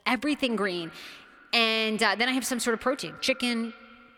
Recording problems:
echo of what is said; faint; throughout; 200 ms later, 20 dB below the speech

